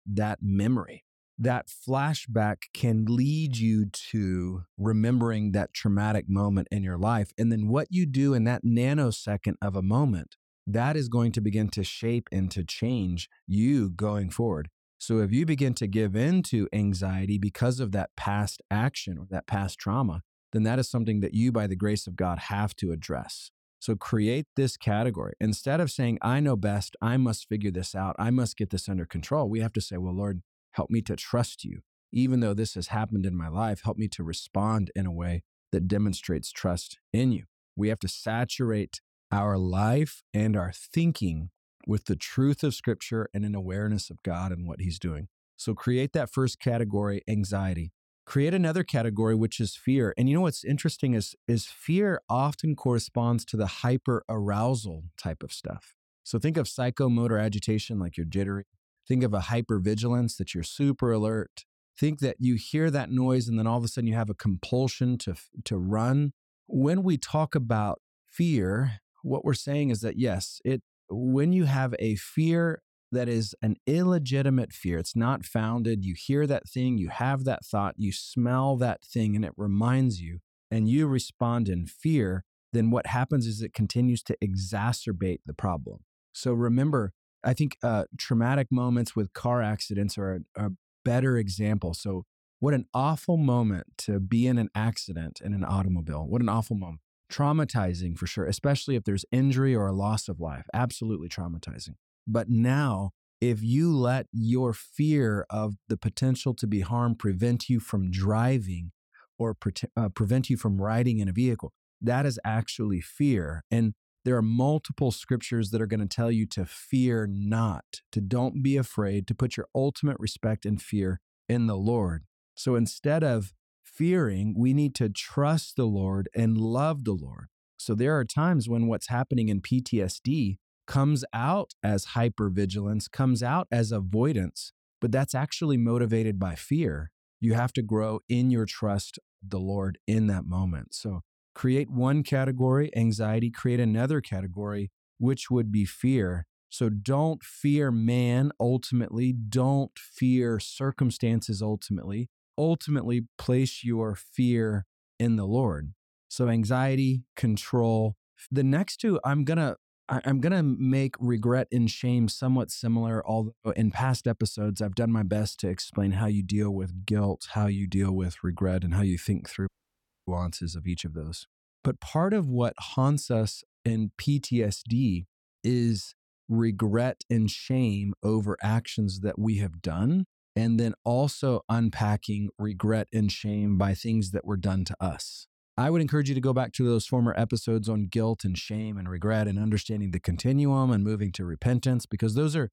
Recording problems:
audio cutting out; at 2:50 for 0.5 s

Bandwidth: 17 kHz